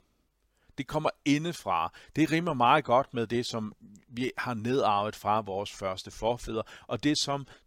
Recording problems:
none

